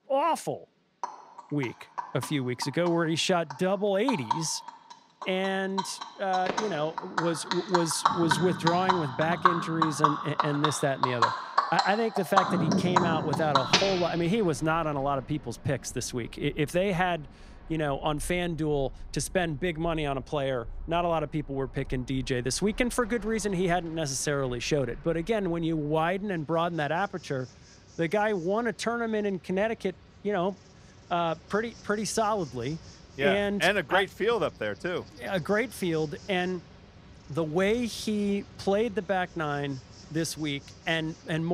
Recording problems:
animal sounds; loud; throughout; 1 dB below the speech
abrupt cut into speech; at the end

